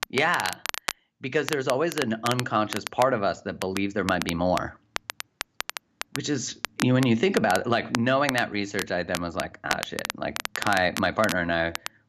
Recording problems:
crackle, like an old record; loud; 8 dB below the speech

